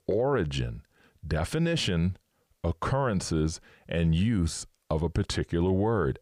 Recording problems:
none

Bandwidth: 15 kHz